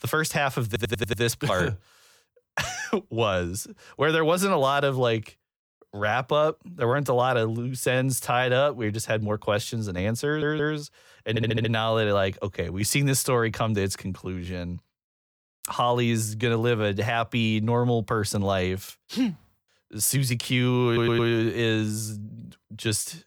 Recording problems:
audio stuttering; 4 times, first at 0.5 s

